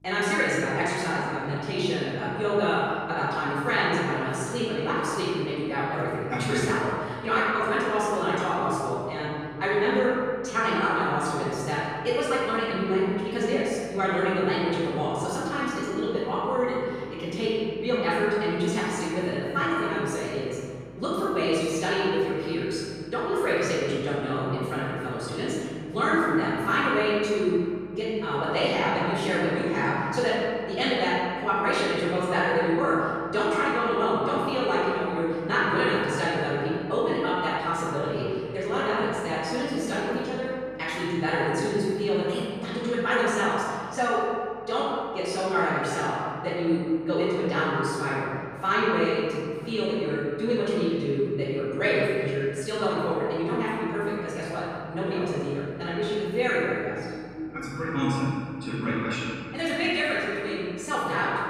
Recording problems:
room echo; strong; dies away in 2.1 s
off-mic speech; far
wrong speed, natural pitch; too fast; 1.6 times normal speed
electrical hum; faint; throughout; 50 Hz, 25 dB below the speech

